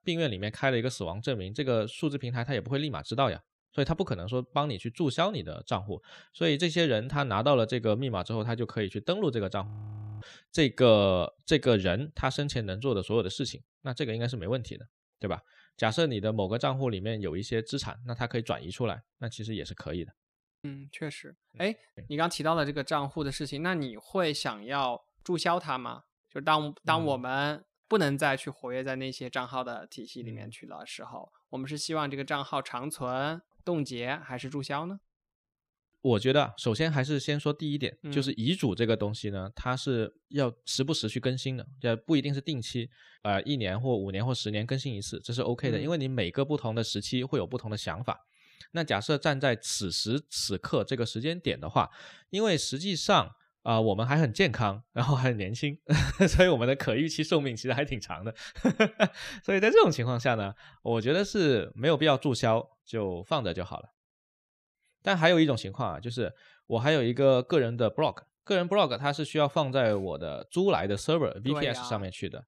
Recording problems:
audio freezing; at 9.5 s for 0.5 s and at 20 s

